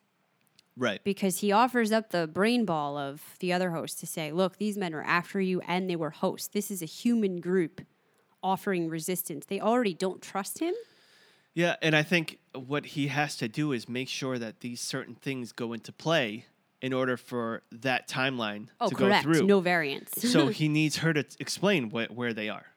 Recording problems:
none

